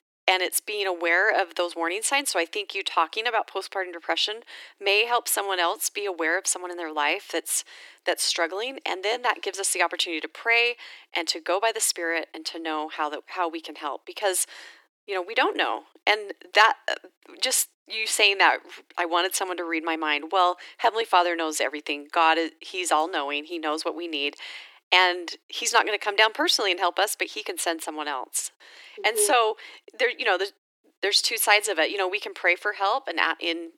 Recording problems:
thin; very; fading below 300 Hz

